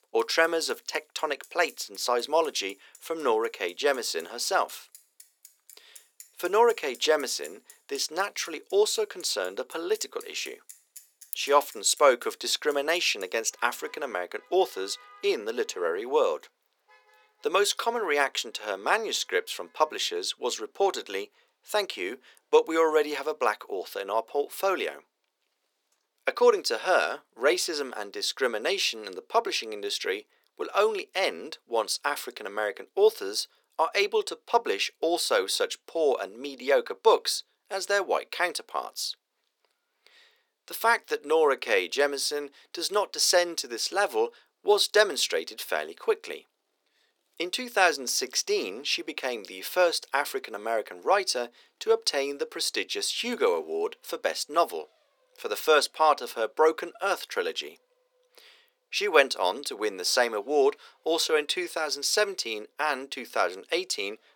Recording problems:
thin; very; fading below 400 Hz
traffic noise; faint; throughout; 25 dB below the speech

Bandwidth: 18.5 kHz